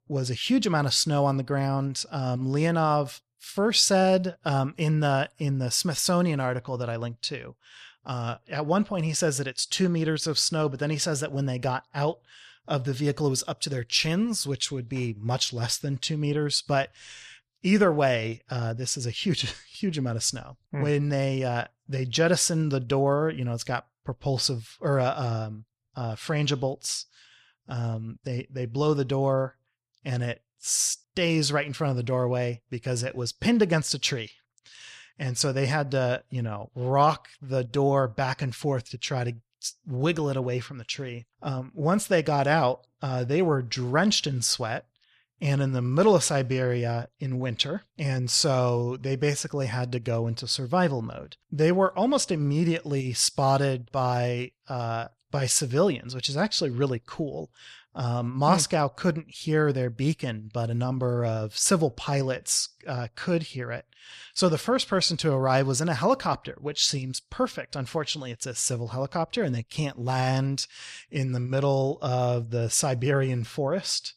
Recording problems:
none

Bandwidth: 13.5 kHz